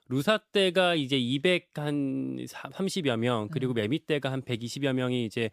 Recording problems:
none

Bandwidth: 15 kHz